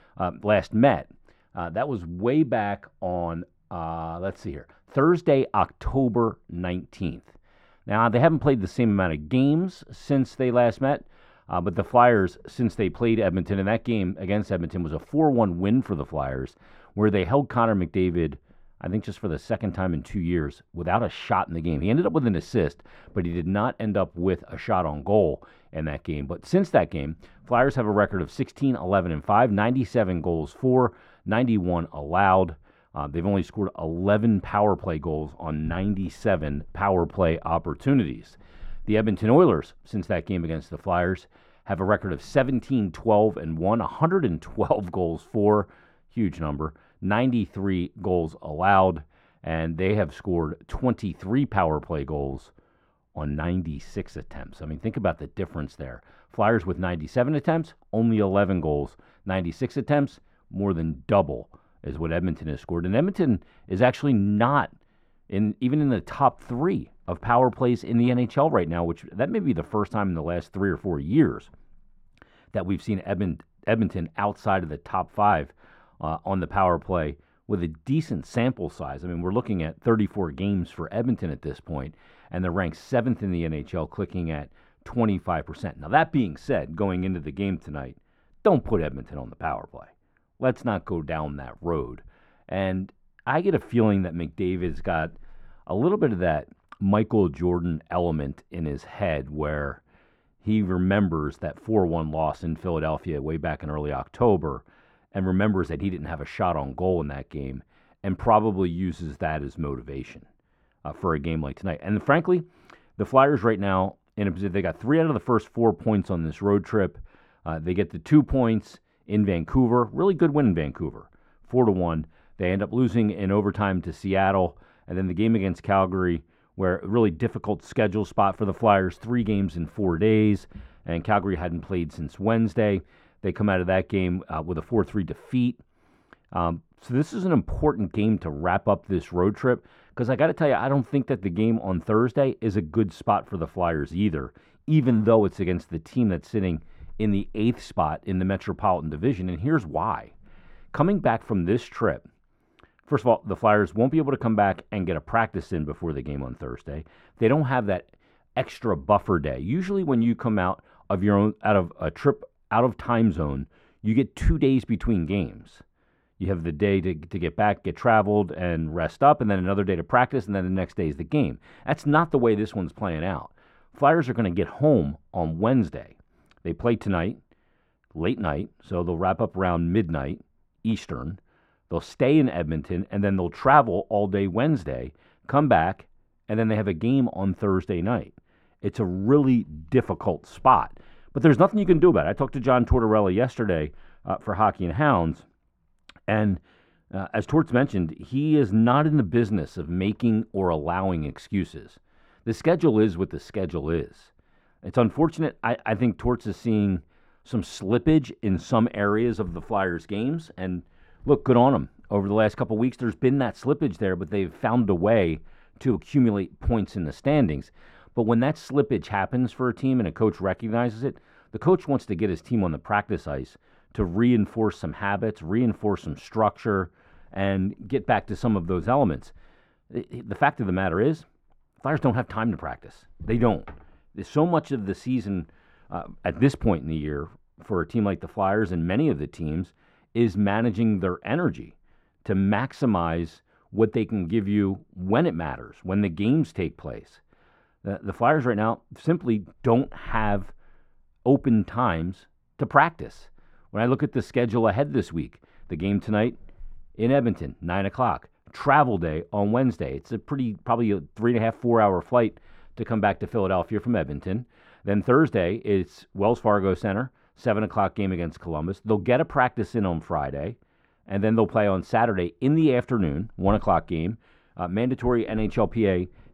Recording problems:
muffled; very; fading above 2.5 kHz

